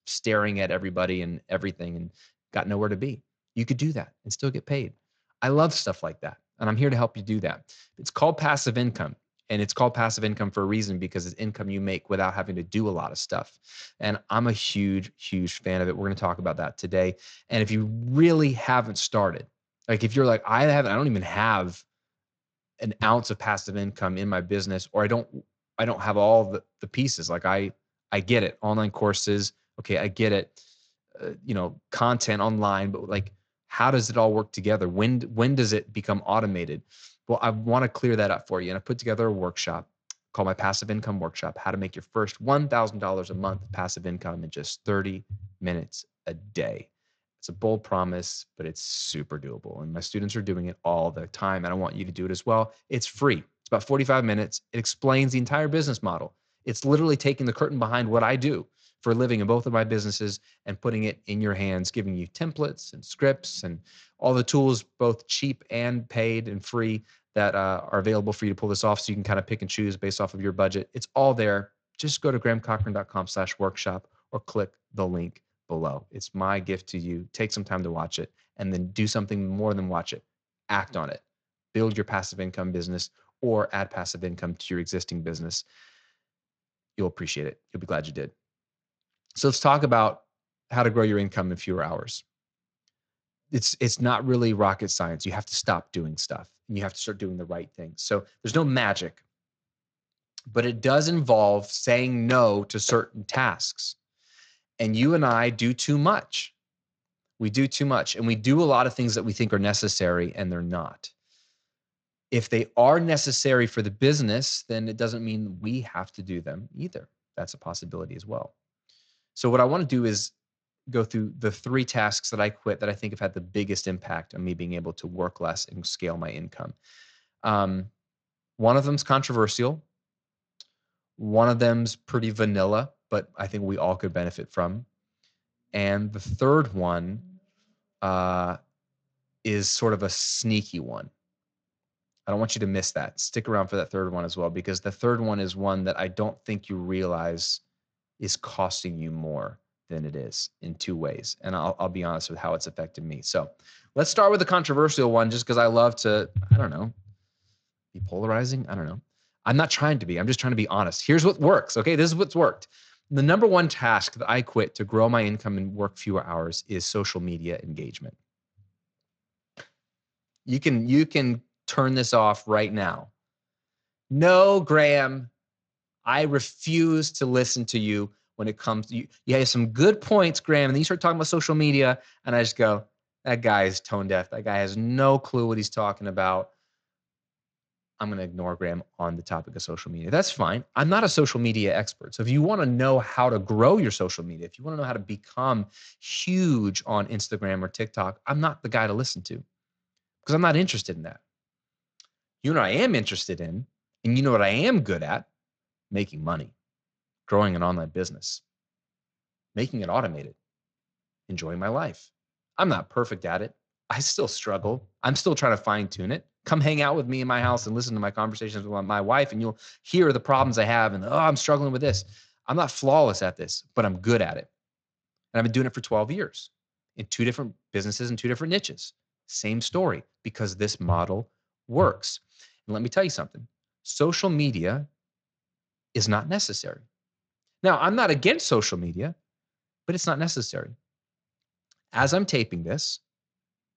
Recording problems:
garbled, watery; slightly

